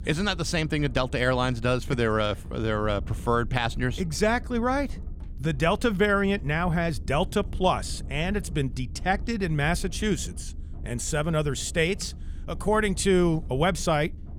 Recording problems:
low rumble; faint; throughout; 25 dB below the speech

